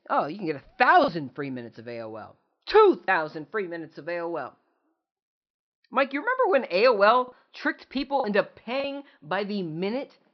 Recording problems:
high frequencies cut off; noticeable; nothing above 5.5 kHz
choppy; occasionally; 2% of the speech affected

